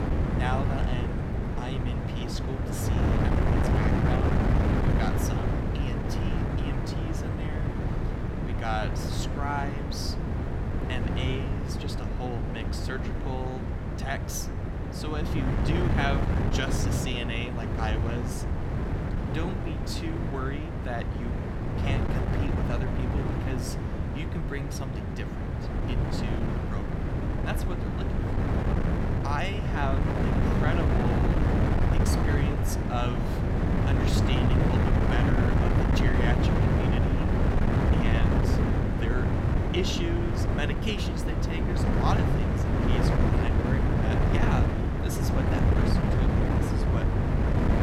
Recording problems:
wind noise on the microphone; heavy; 3 dB above the speech

